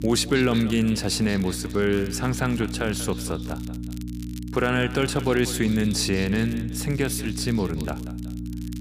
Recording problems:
echo of what is said; noticeable; throughout; 190 ms later, 15 dB below the speech
electrical hum; noticeable; throughout; 60 Hz, 15 dB below the speech
crackle, like an old record; faint; 25 dB below the speech

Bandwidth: 15 kHz